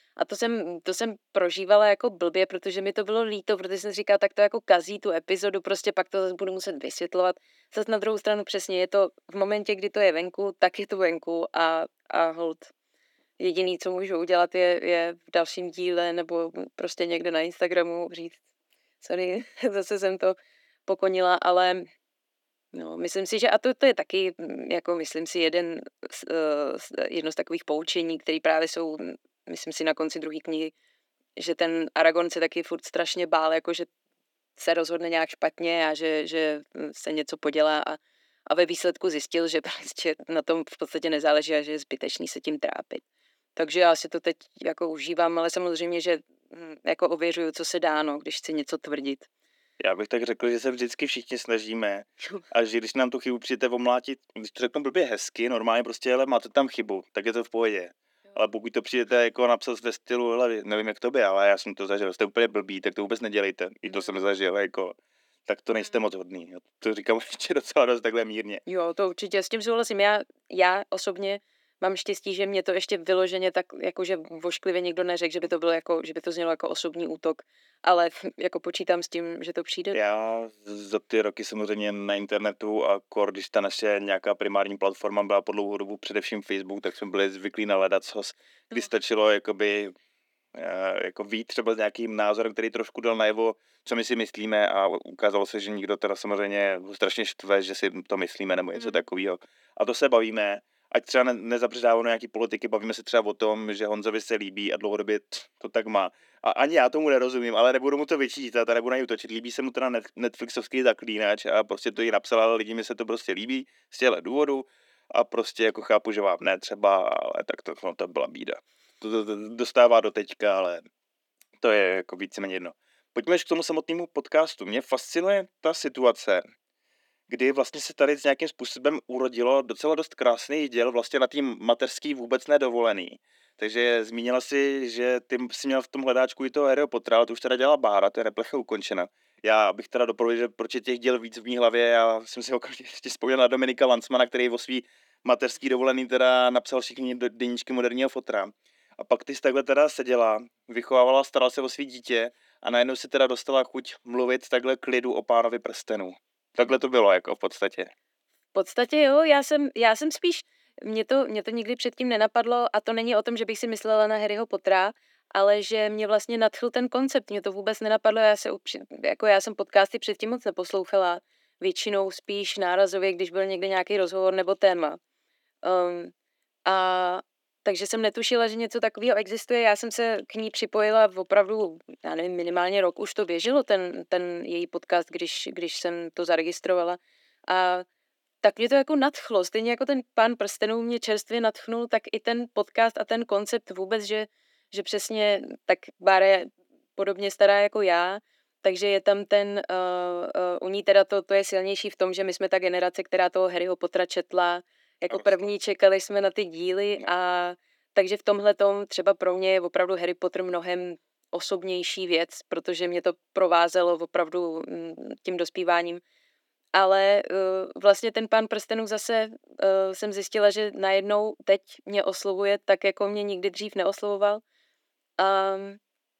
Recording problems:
thin; somewhat; fading below 300 Hz

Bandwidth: 18.5 kHz